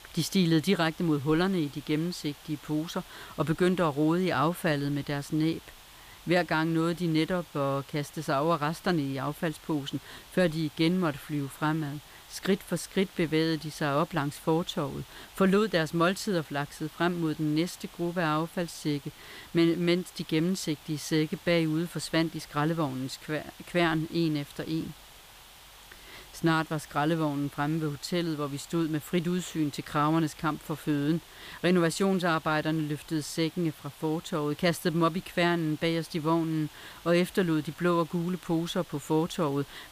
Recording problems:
hiss; faint; throughout; 20 dB below the speech

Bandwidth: 15 kHz